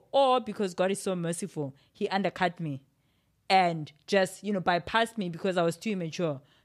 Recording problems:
none

